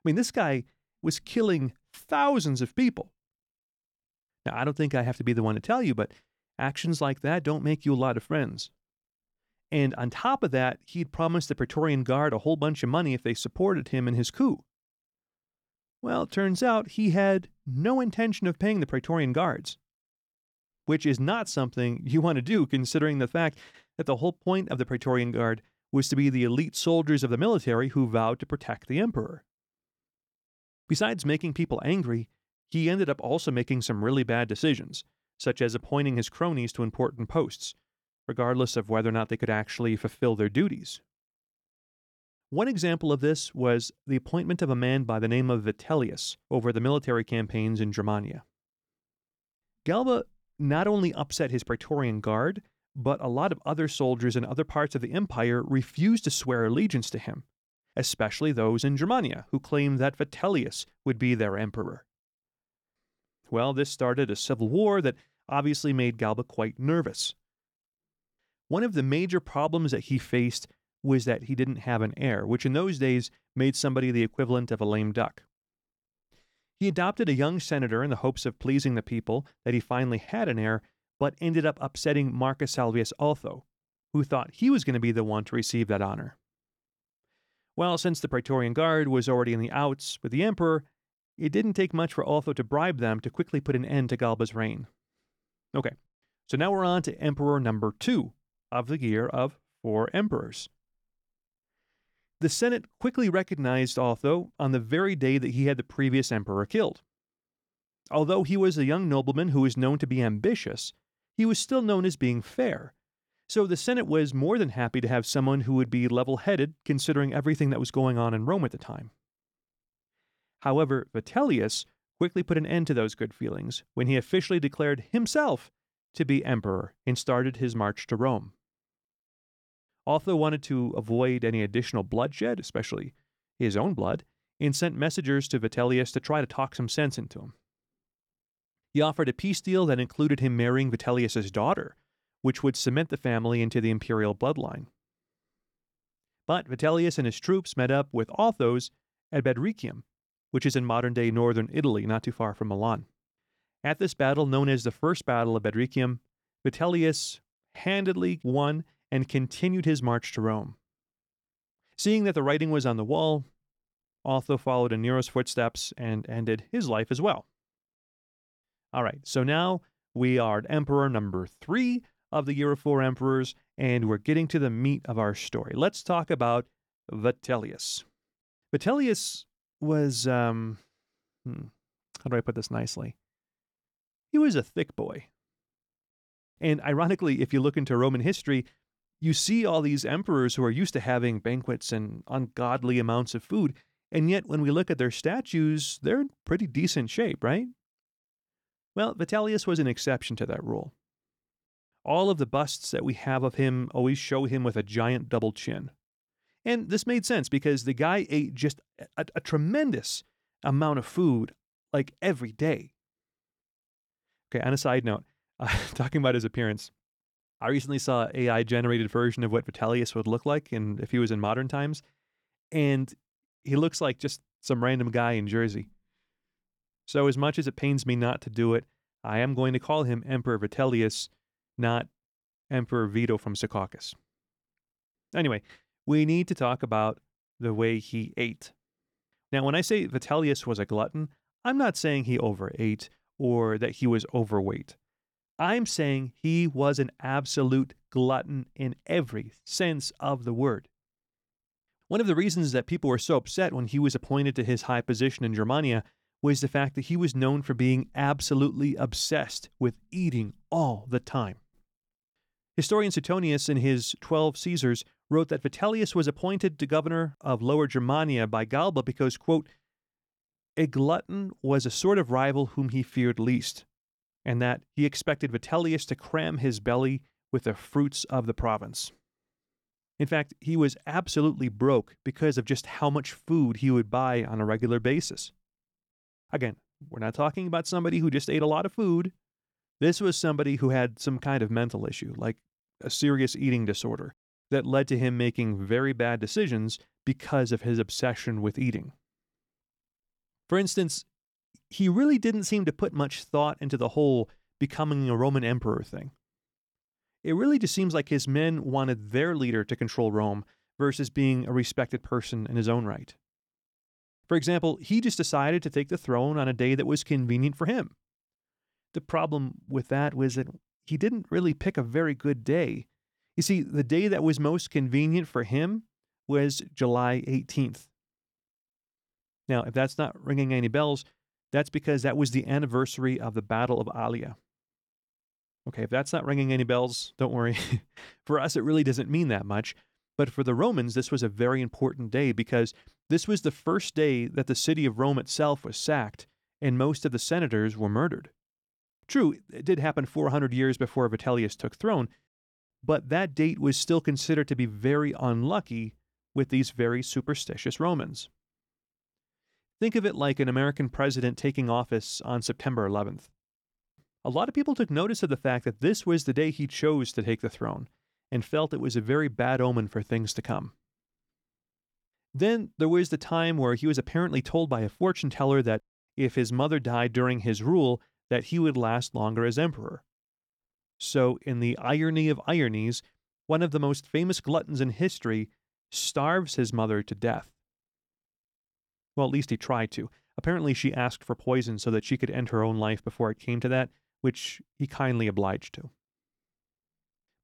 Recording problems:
none

